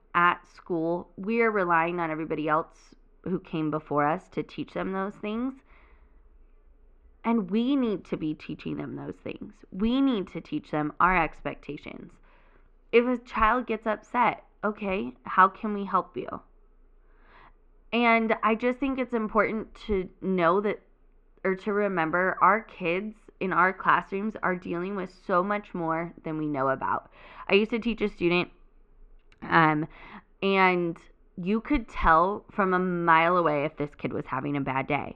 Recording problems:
muffled; very; fading above 2.5 kHz

